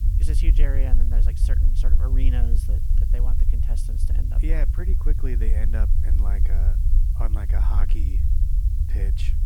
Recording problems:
low rumble; loud; throughout; 3 dB below the speech
hiss; noticeable; throughout; 15 dB below the speech

